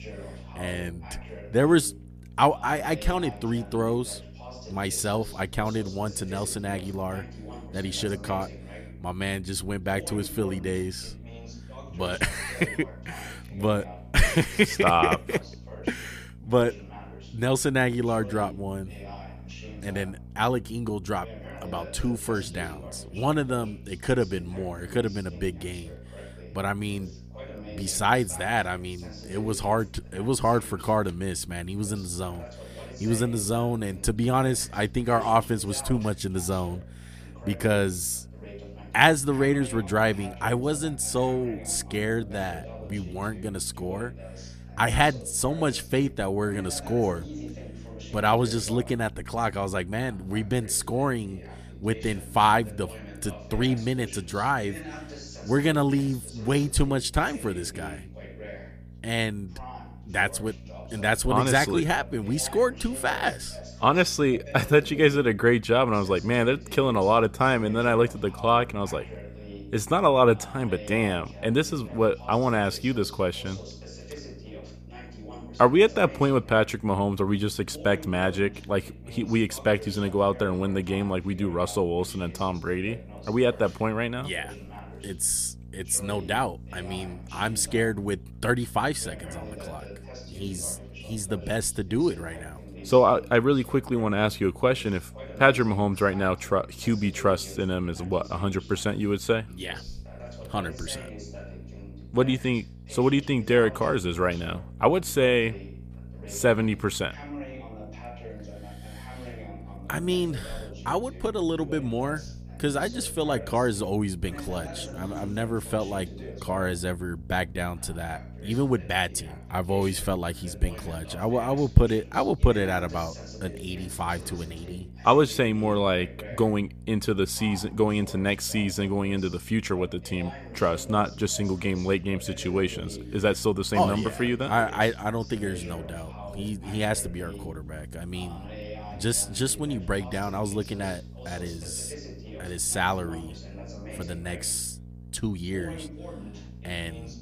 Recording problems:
voice in the background; noticeable; throughout; 20 dB below the speech
electrical hum; faint; throughout; 60 Hz, 30 dB below the speech

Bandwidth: 14.5 kHz